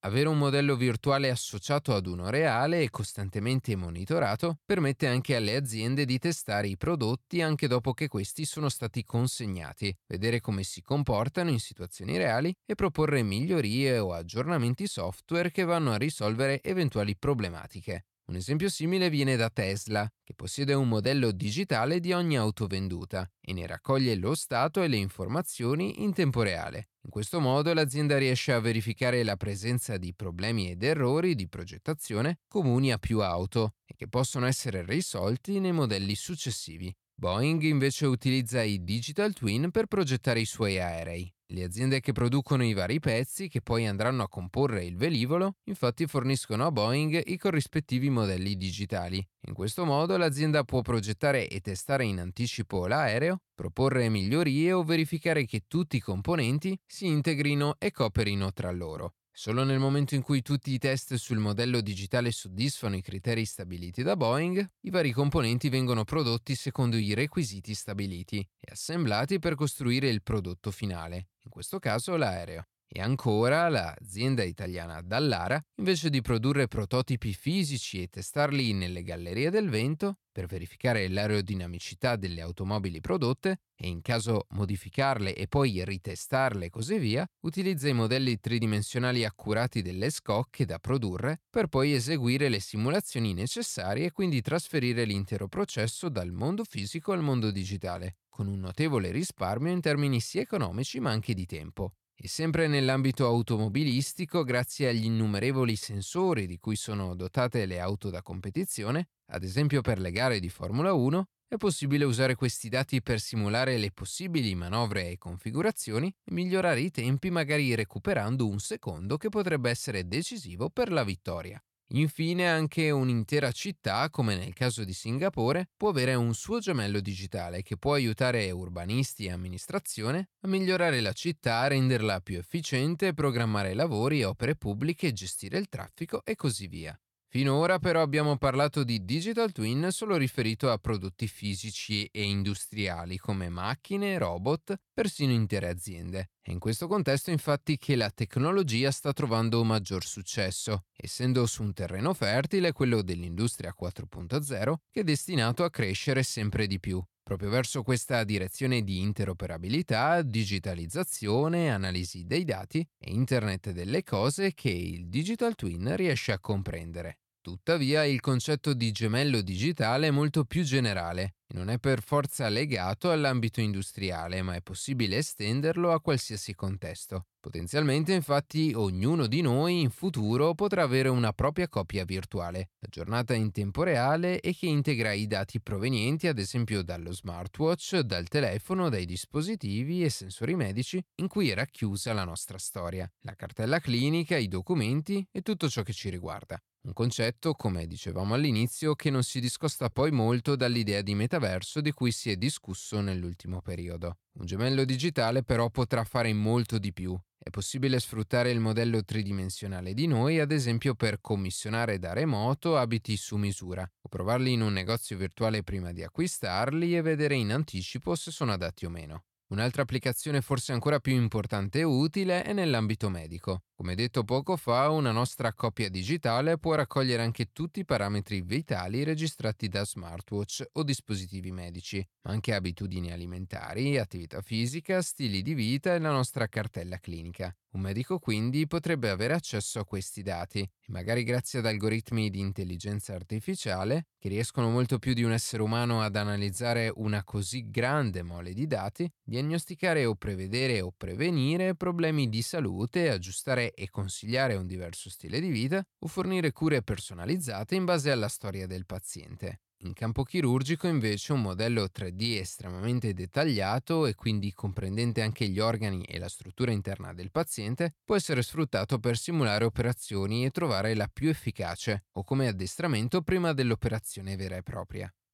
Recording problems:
none

